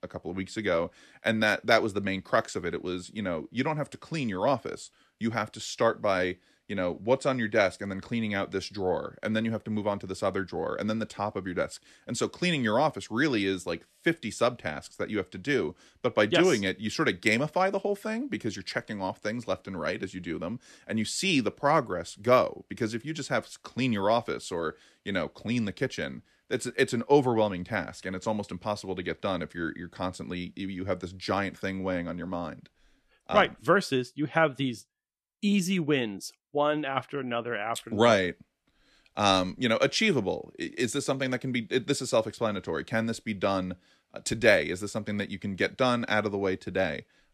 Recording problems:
none

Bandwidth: 14 kHz